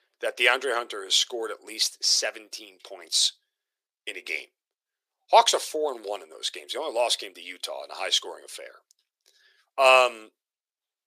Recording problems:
thin; very; fading below 350 Hz

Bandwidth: 15 kHz